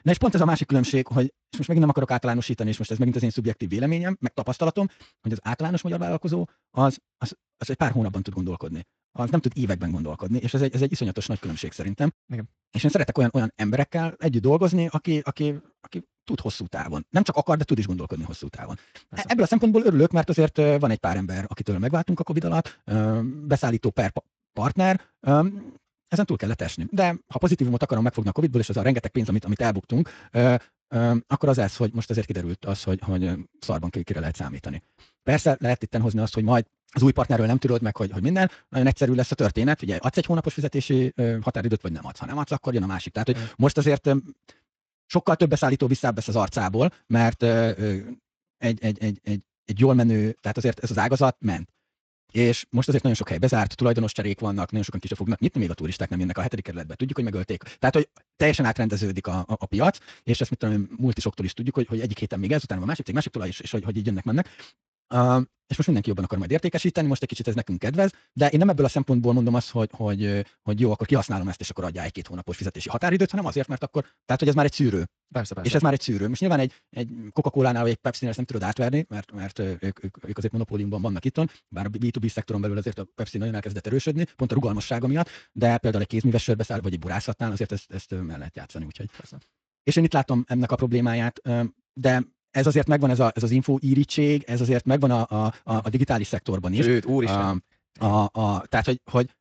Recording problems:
wrong speed, natural pitch; too fast; 1.7 times normal speed
garbled, watery; slightly; nothing above 7.5 kHz

